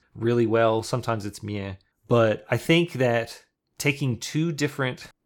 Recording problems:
none

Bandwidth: 18 kHz